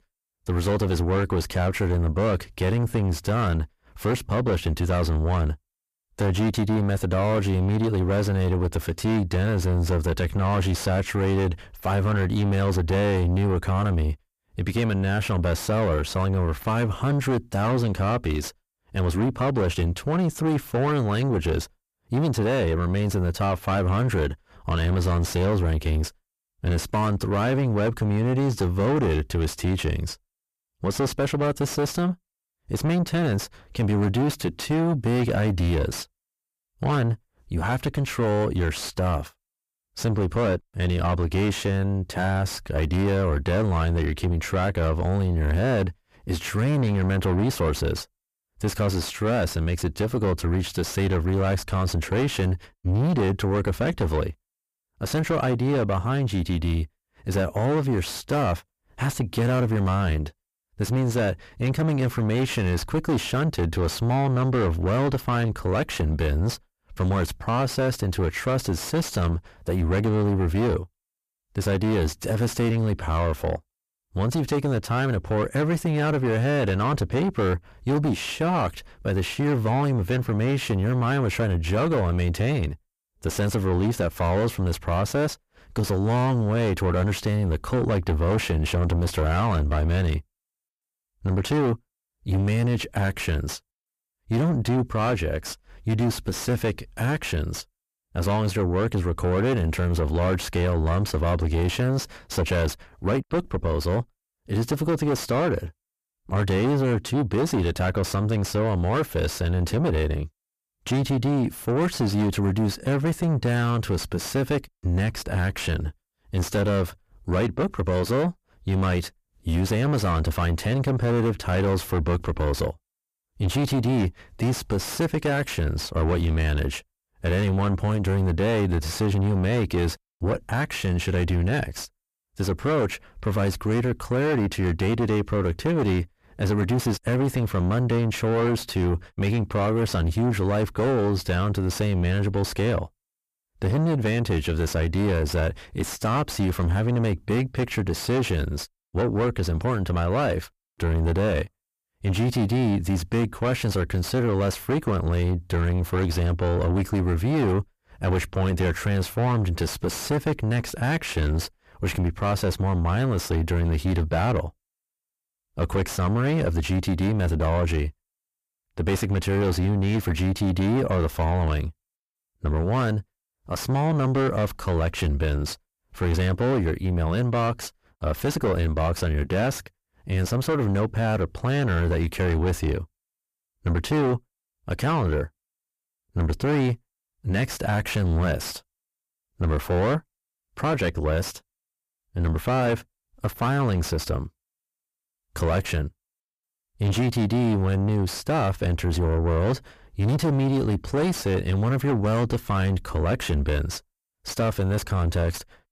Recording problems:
distortion; heavy; 6 dB below the speech

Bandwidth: 14.5 kHz